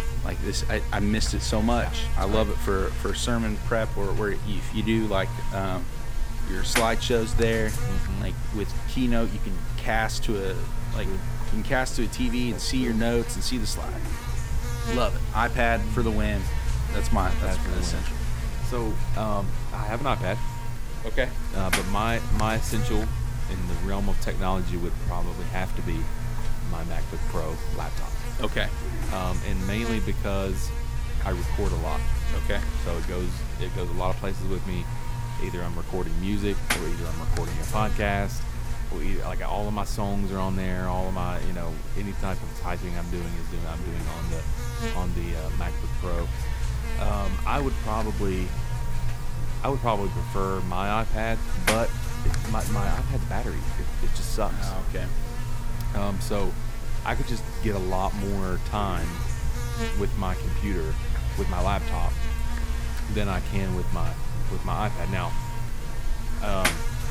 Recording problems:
electrical hum; loud; throughout; 50 Hz, 6 dB below the speech

